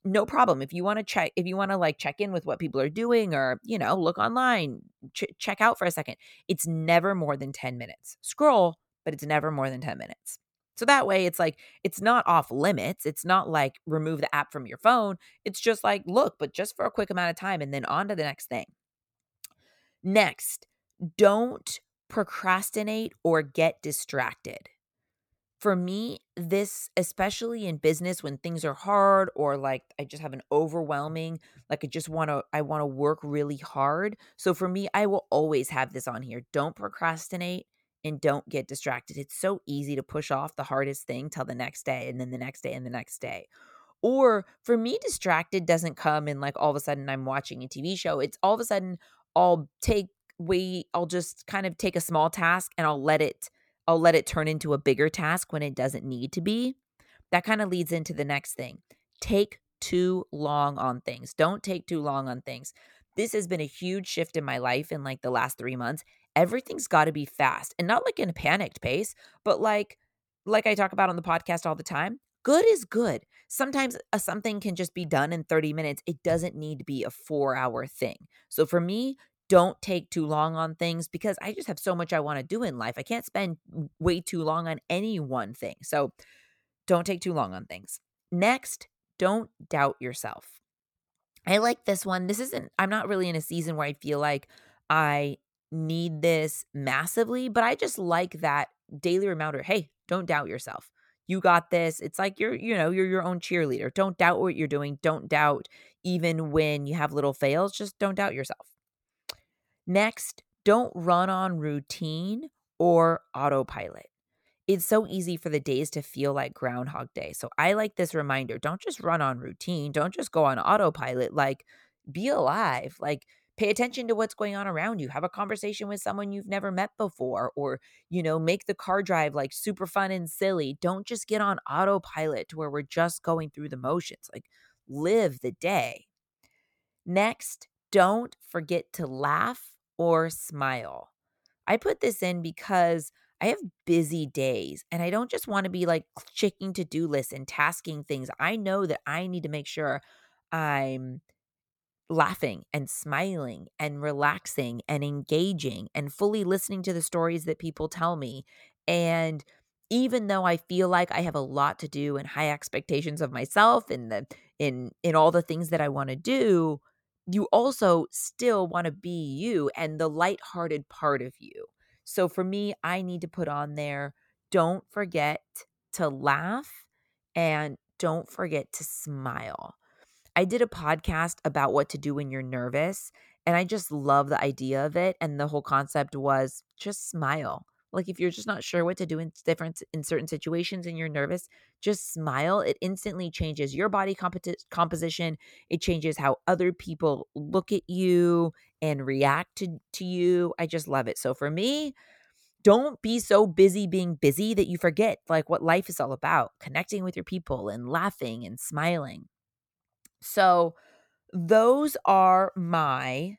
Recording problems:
none

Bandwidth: 18.5 kHz